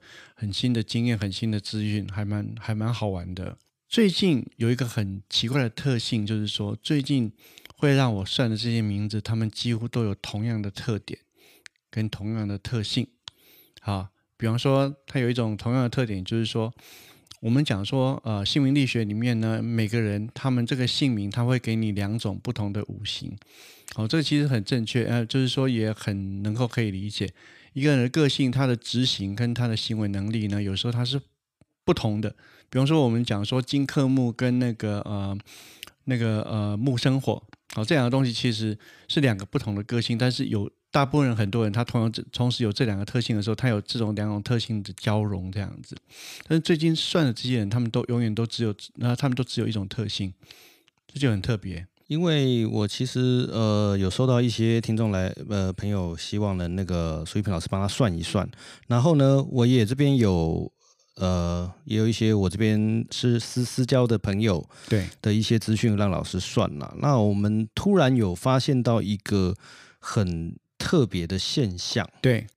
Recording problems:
none

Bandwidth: 15 kHz